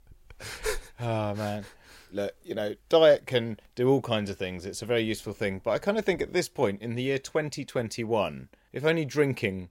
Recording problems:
none

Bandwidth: 16 kHz